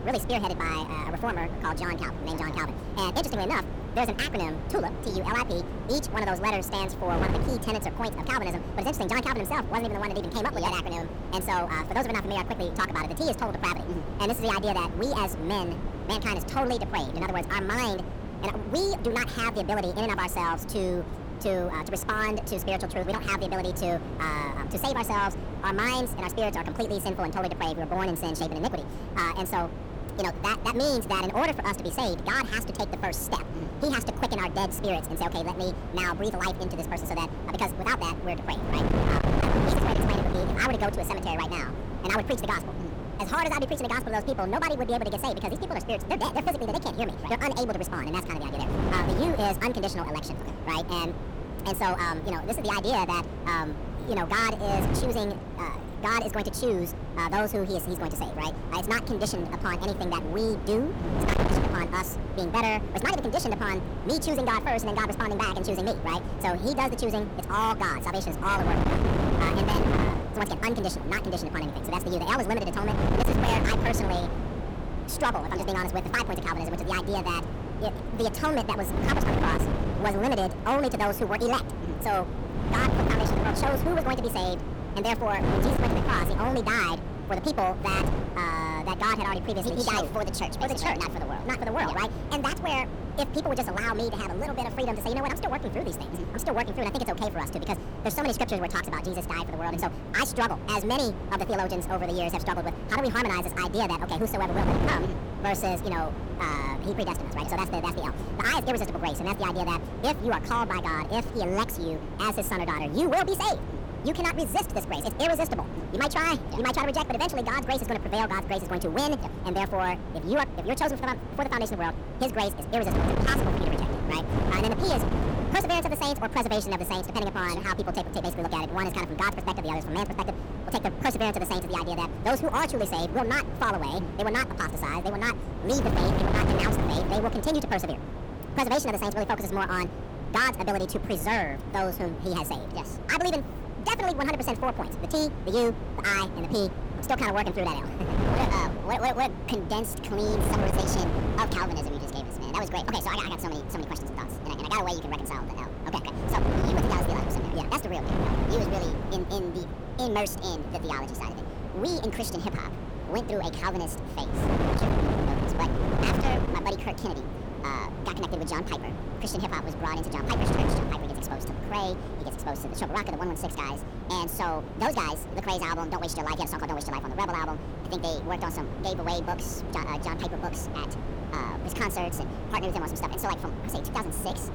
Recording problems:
wrong speed and pitch; too fast and too high; 1.7 times normal speed
distortion; slight; 10 dB below the speech
wind noise on the microphone; heavy; 8 dB below the speech

